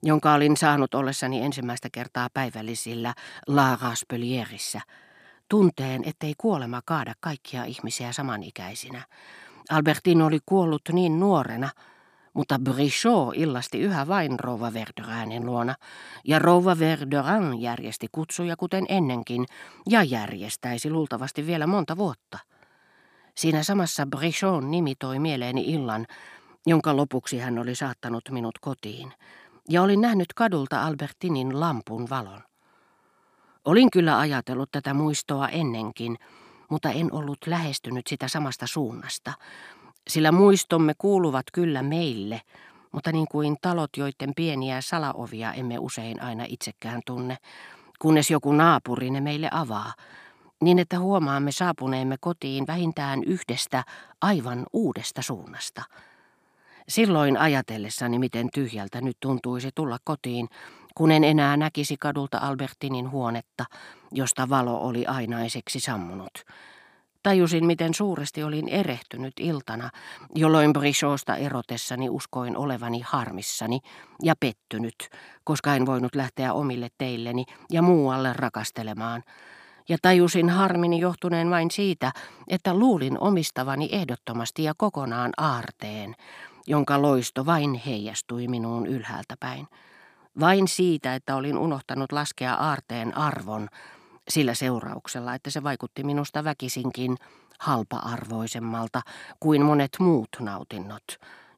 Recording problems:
none

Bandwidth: 15 kHz